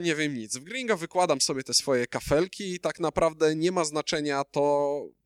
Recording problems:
abrupt cut into speech; at the start

